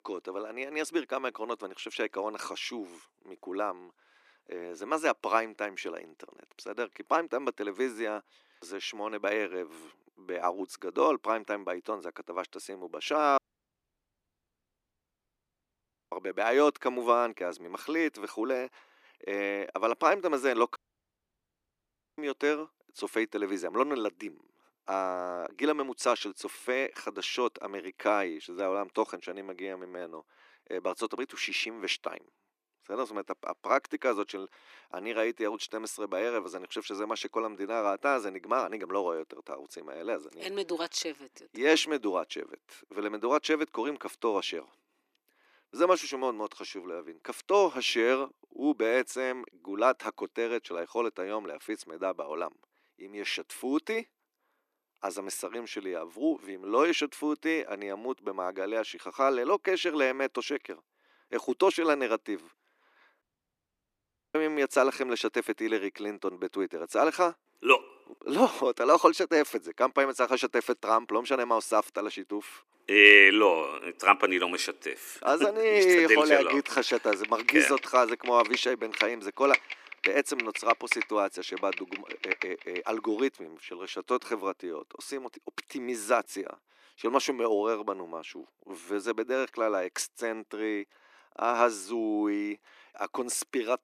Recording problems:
thin; somewhat; fading below 300 Hz
audio cutting out; at 13 s for 2.5 s, at 21 s for 1.5 s and at 1:03 for 1 s
keyboard typing; loud; from 1:16 to 1:23; peak 1 dB above the speech

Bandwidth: 14.5 kHz